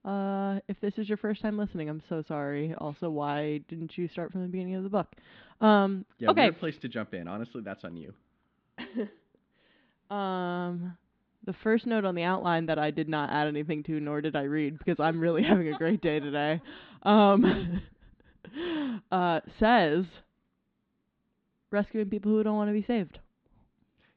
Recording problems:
muffled; very slightly; fading above 4 kHz

